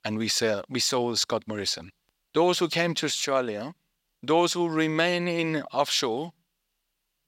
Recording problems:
thin; somewhat; fading below 850 Hz

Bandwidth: 16 kHz